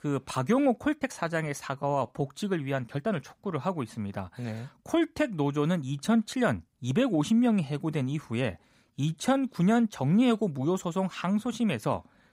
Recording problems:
uneven, jittery; slightly; from 1 to 9.5 s

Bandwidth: 15.5 kHz